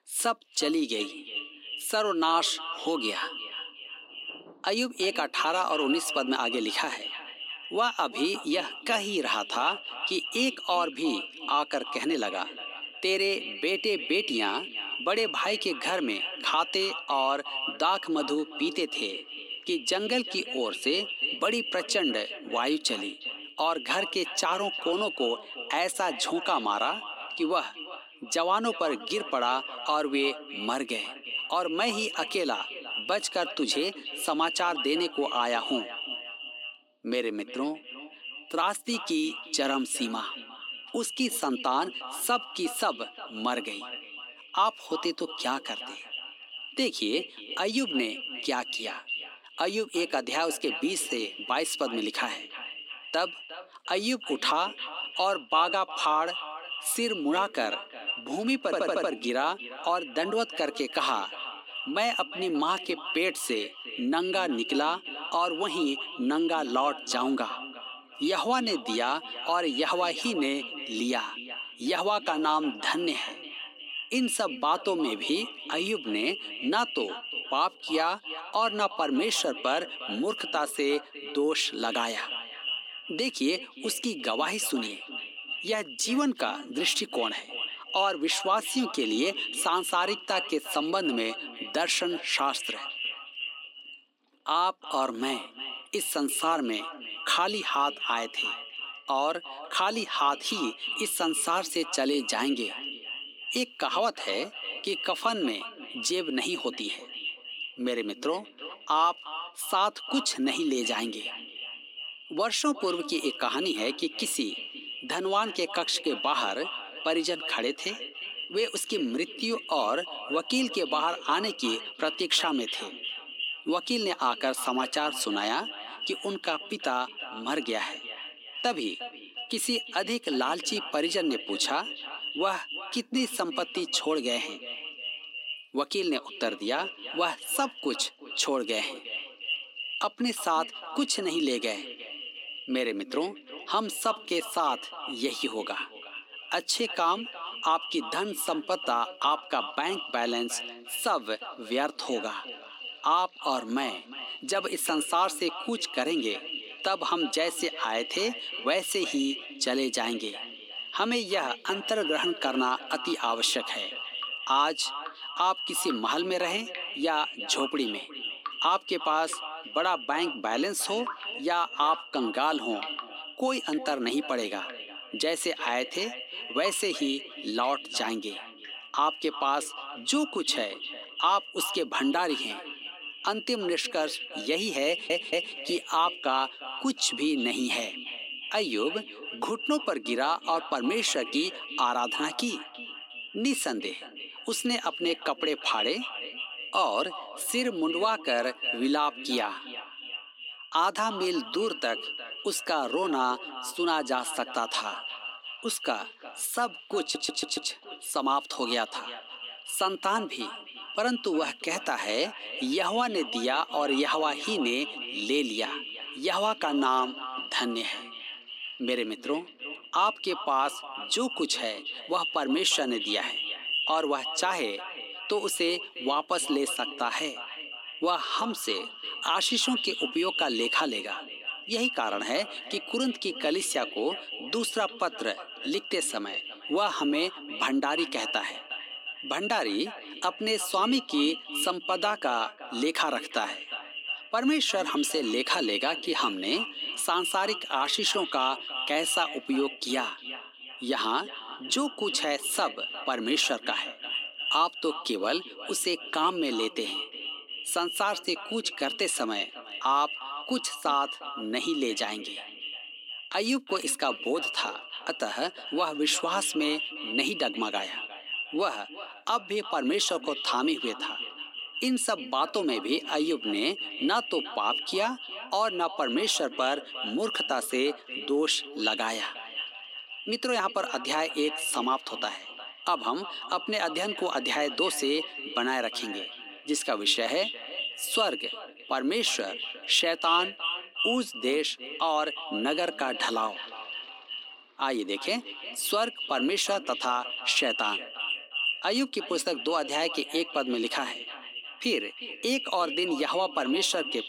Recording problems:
echo of what is said; strong; throughout; 360 ms later, 7 dB below the speech
thin; very slightly; fading below 250 Hz
rain or running water; faint; throughout; 25 dB below the speech
audio stuttering; at 59 s, at 3:05 and at 3:27

